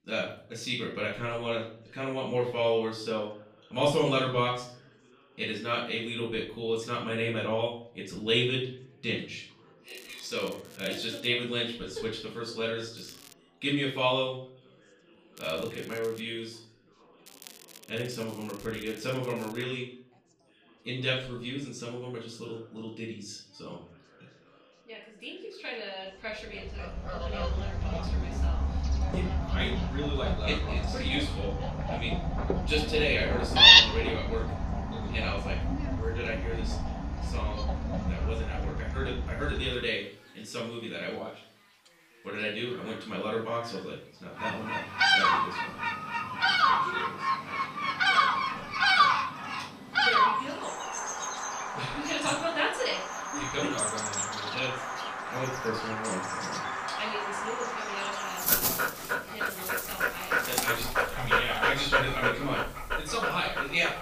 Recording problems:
off-mic speech; far
room echo; noticeable; dies away in 0.5 s
animal sounds; very loud; from 27 s on; 6 dB above the speech
crackling; noticeable; 4 times, first at 10 s; 15 dB below the speech
background chatter; faint; throughout; 3 voices, 25 dB below the speech

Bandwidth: 15 kHz